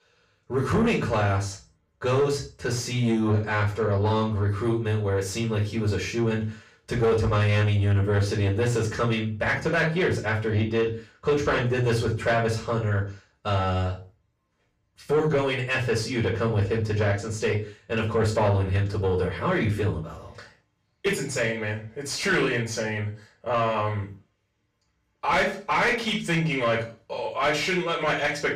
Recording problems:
off-mic speech; far
room echo; slight; dies away in 0.3 s
distortion; slight; 10 dB below the speech

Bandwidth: 15 kHz